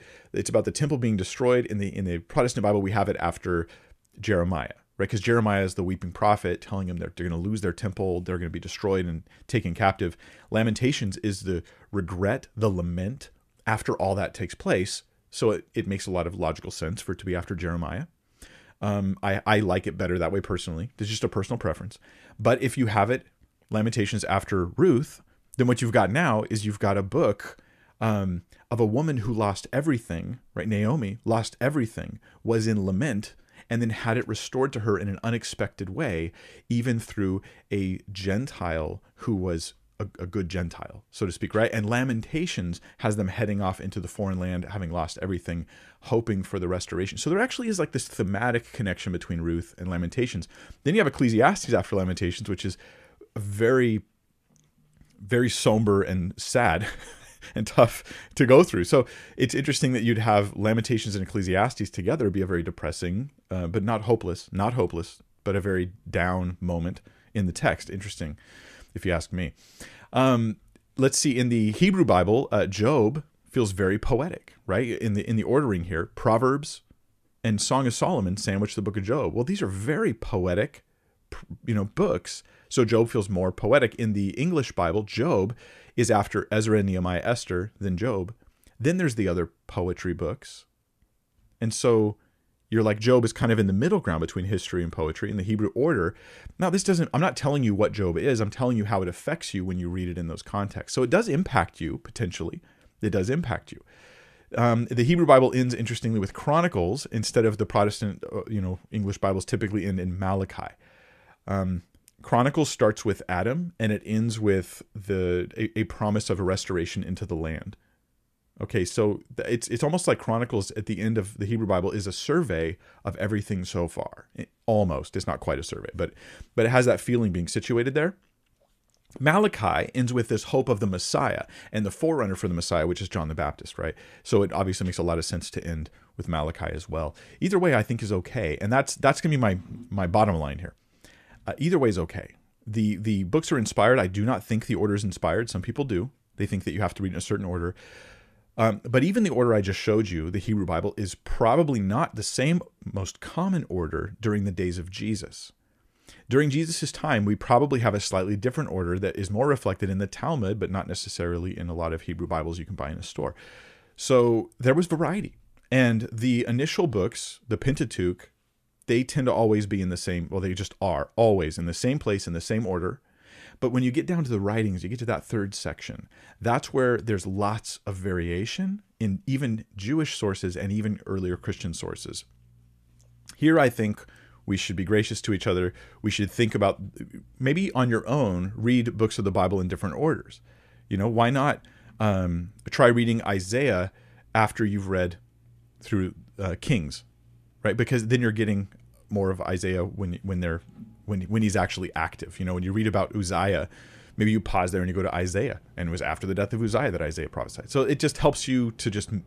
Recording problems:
none

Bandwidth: 14.5 kHz